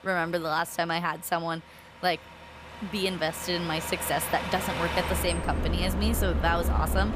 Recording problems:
traffic noise; loud; throughout; 2 dB below the speech

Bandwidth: 15 kHz